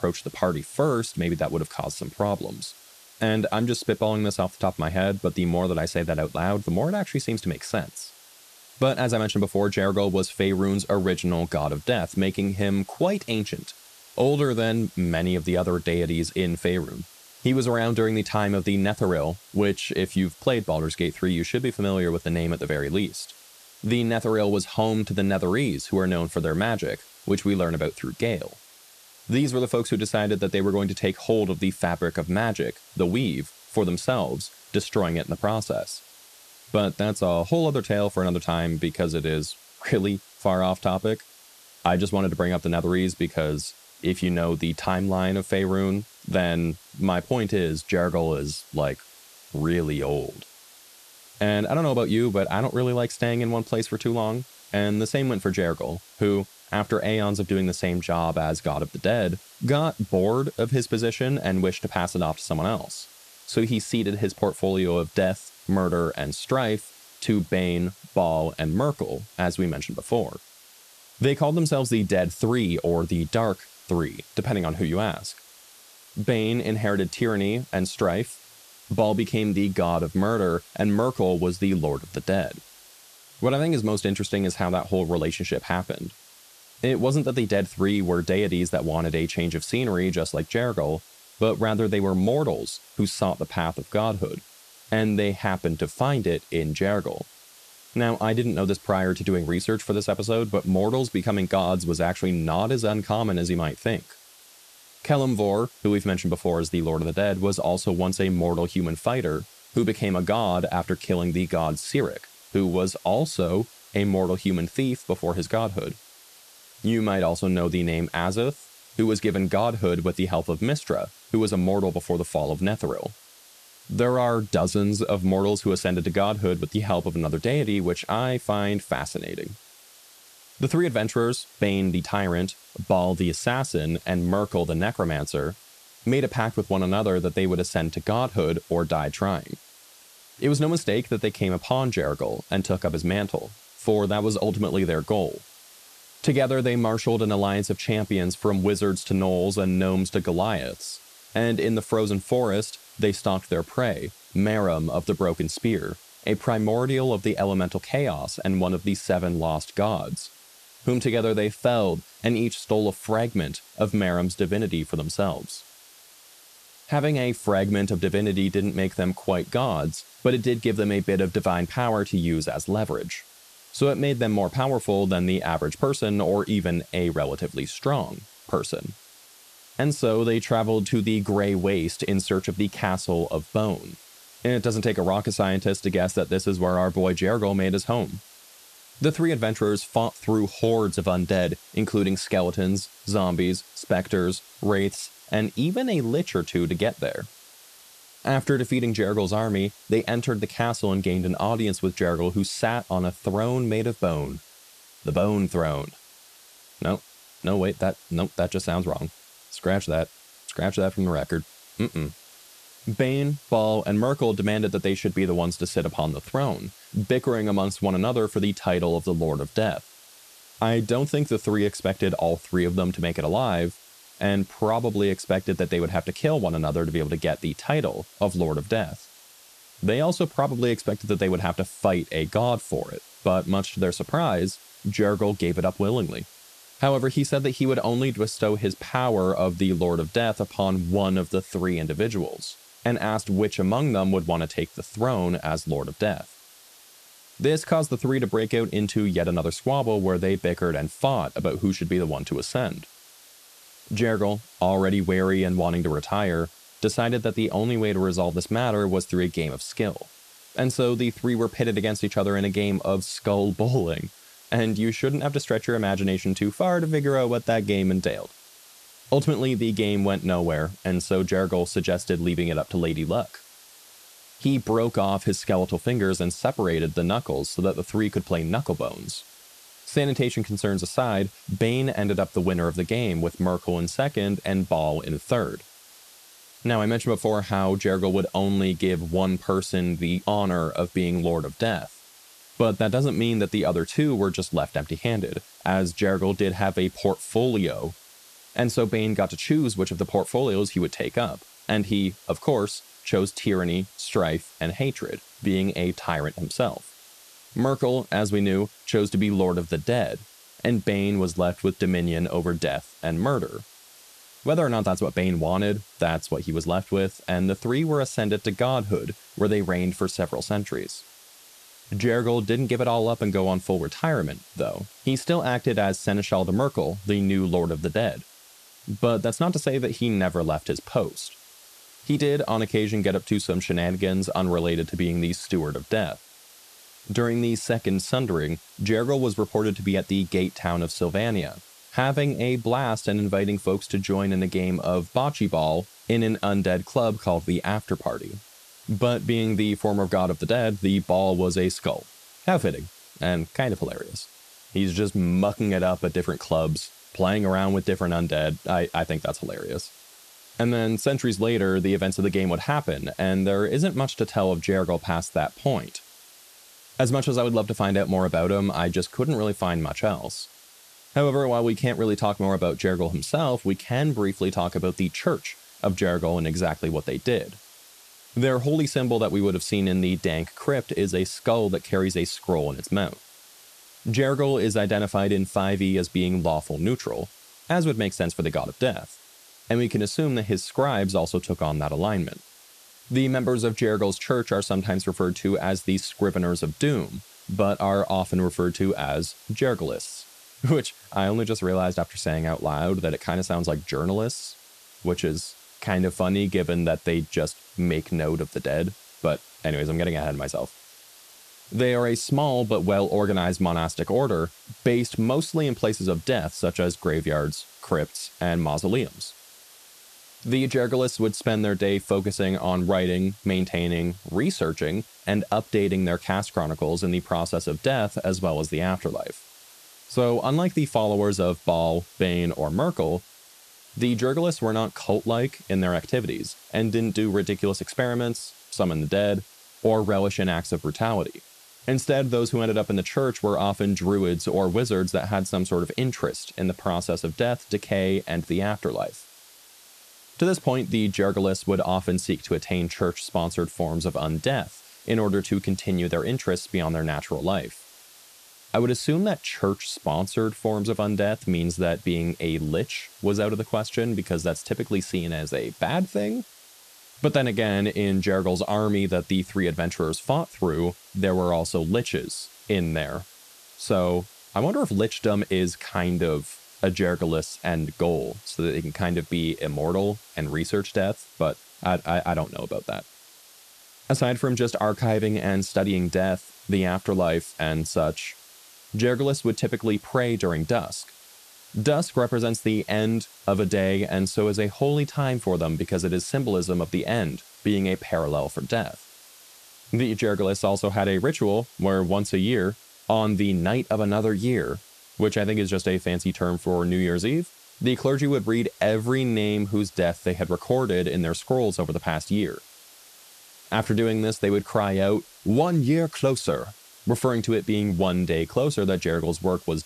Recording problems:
hiss; faint; throughout; 25 dB below the speech

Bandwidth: 14 kHz